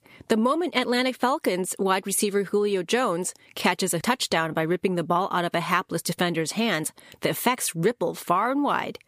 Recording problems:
squashed, flat; somewhat

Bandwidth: 15 kHz